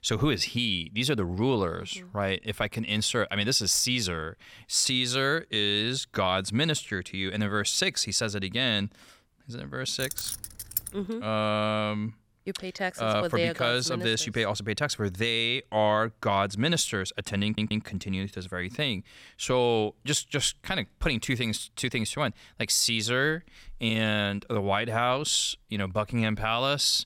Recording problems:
jangling keys; noticeable; at 10 s; peak 5 dB below the speech
audio stuttering; at 17 s

